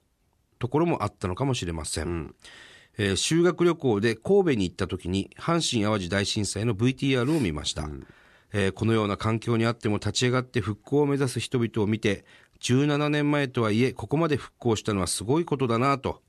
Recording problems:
none

